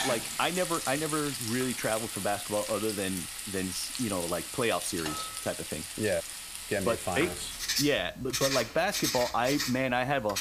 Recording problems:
household noises; loud; throughout; 3 dB below the speech

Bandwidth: 15 kHz